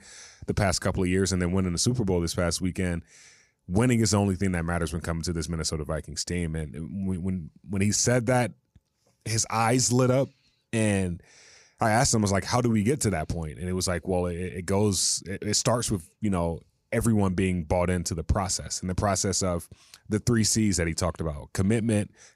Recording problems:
none

